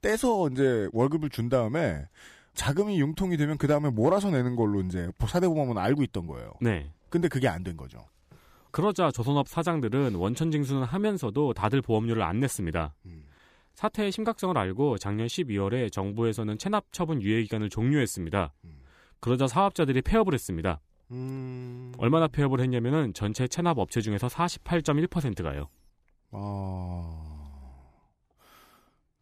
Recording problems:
none

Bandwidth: 15 kHz